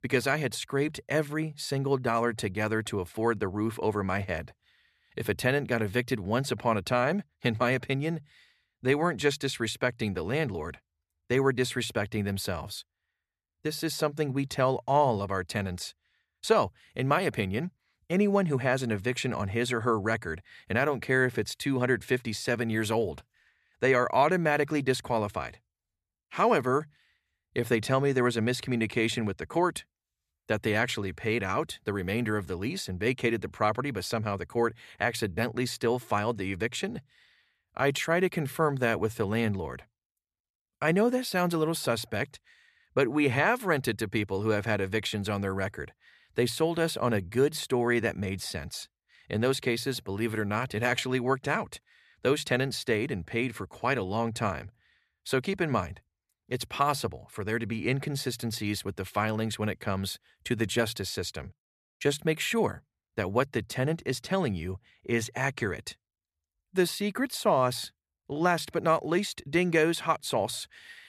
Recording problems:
none

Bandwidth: 14 kHz